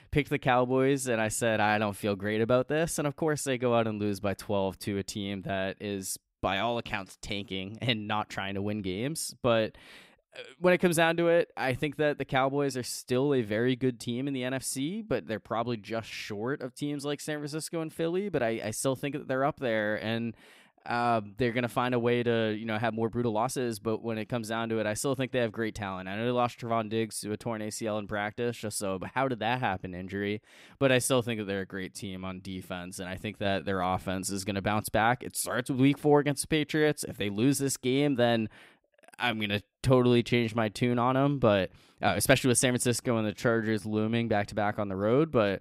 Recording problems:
uneven, jittery; strongly; from 3 to 44 s

